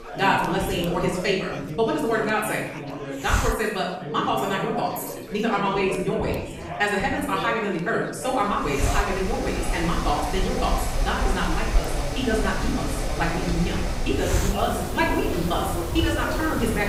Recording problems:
off-mic speech; far
wrong speed, natural pitch; too fast; 1.6 times normal speed
room echo; noticeable; dies away in 0.8 s
machinery noise; loud; from 8.5 s on; 5 dB below the speech
chatter from many people; loud; throughout; 9 dB below the speech
hiss; very faint; throughout; 8 dB below the speech

